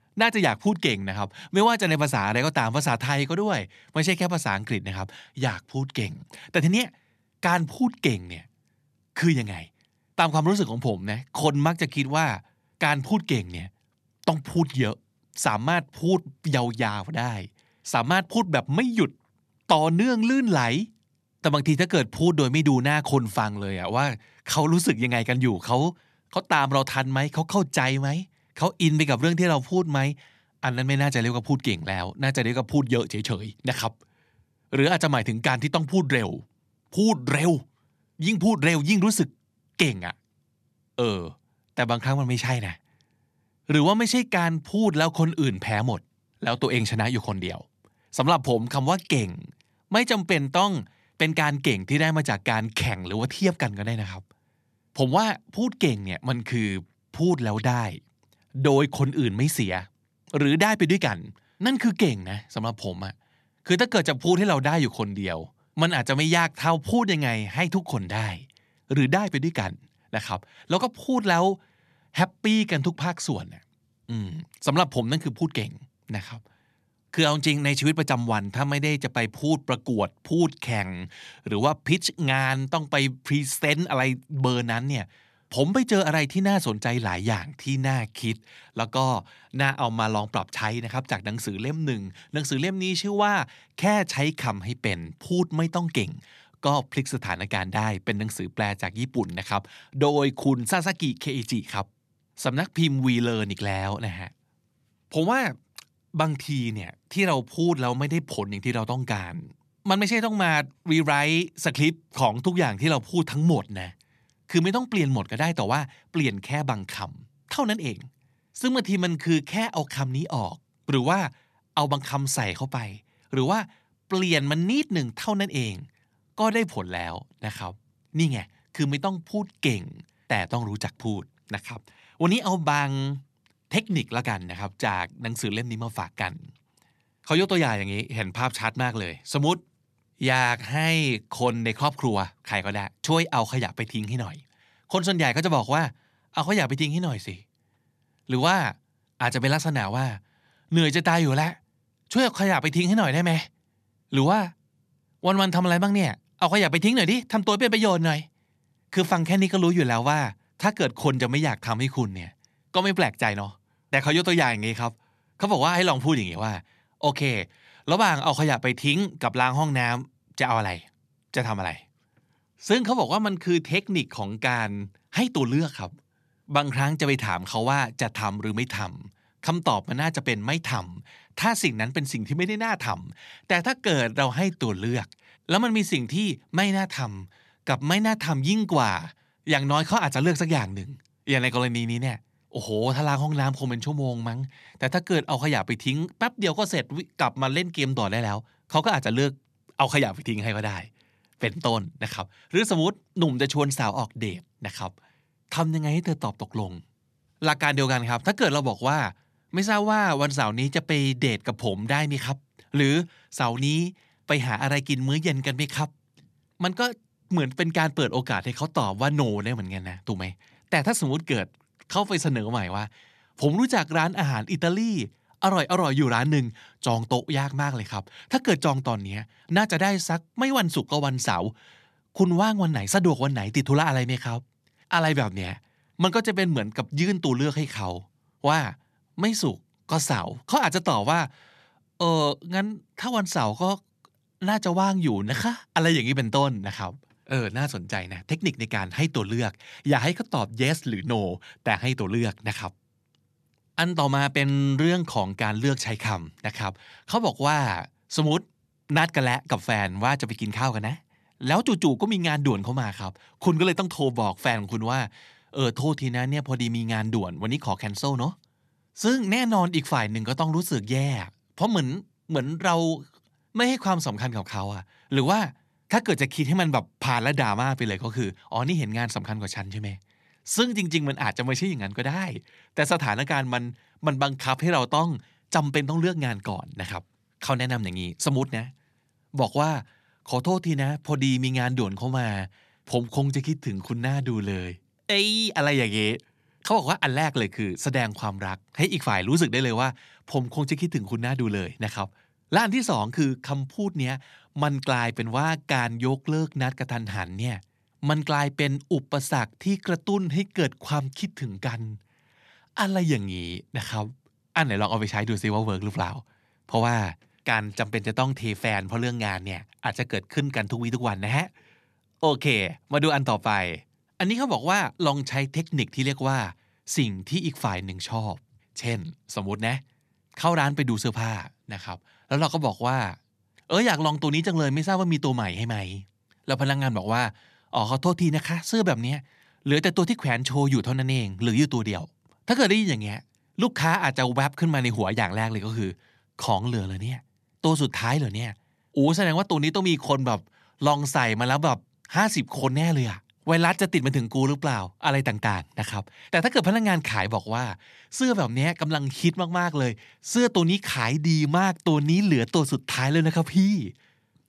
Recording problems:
none

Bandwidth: 13.5 kHz